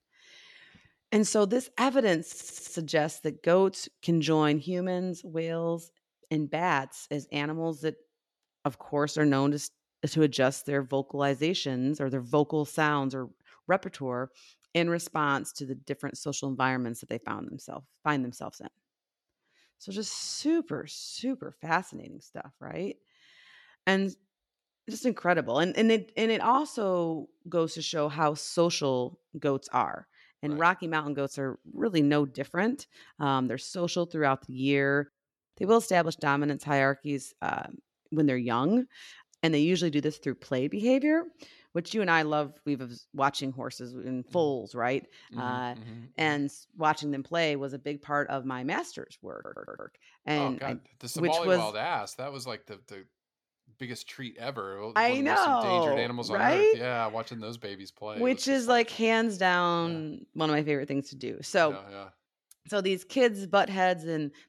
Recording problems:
audio stuttering; at 2.5 s and at 49 s

